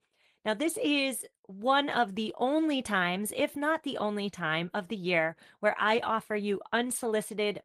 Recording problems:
garbled, watery; slightly; nothing above 12 kHz

